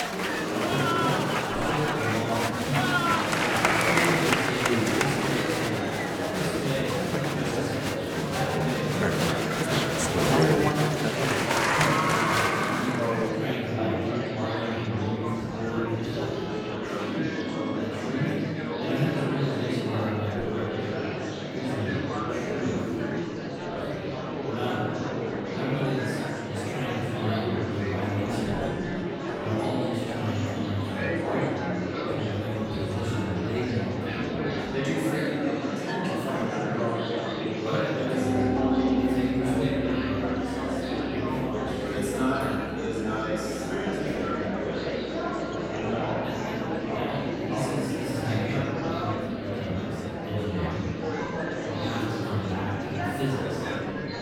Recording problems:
room echo; strong; dies away in 1.5 s
off-mic speech; far
murmuring crowd; very loud; throughout; 4 dB above the speech
background music; loud; throughout; 5 dB below the speech

